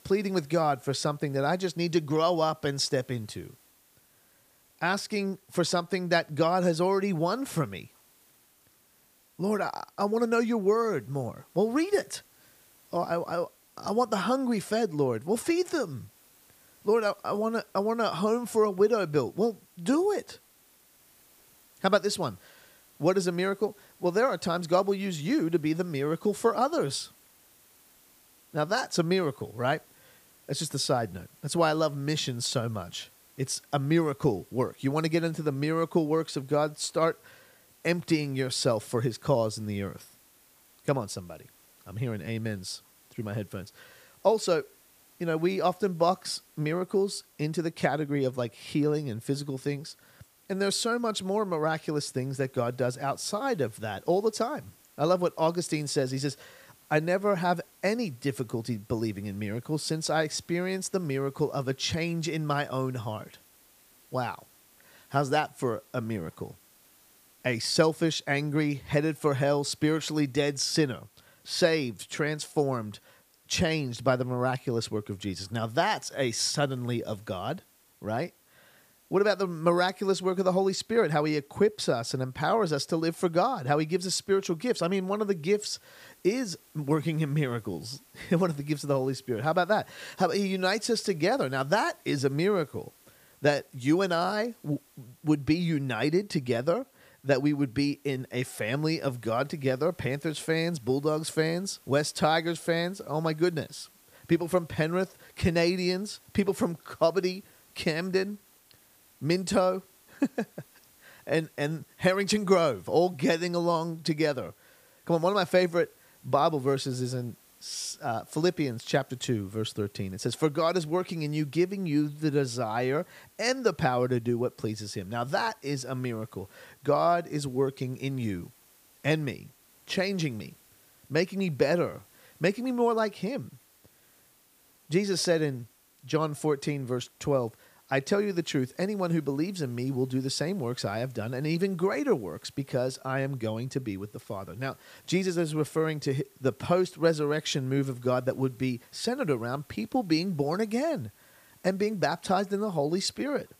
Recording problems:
hiss; faint; throughout; 30 dB below the speech

